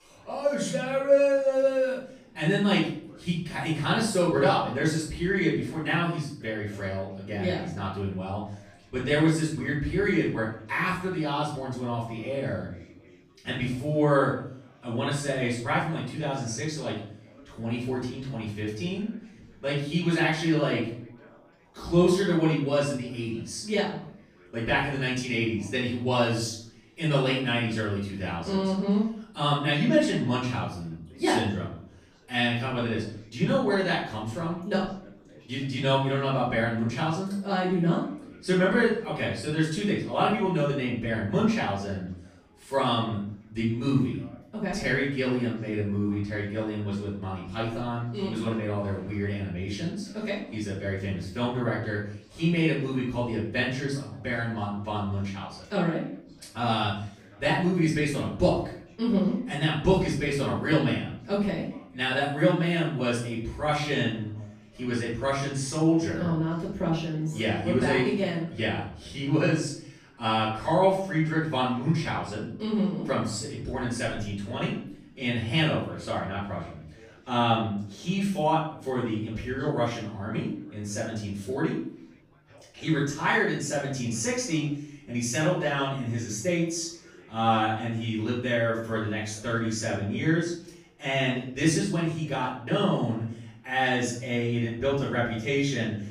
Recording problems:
off-mic speech; far
room echo; noticeable; dies away in 0.5 s
background chatter; faint; throughout; 3 voices, 30 dB below the speech

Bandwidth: 15 kHz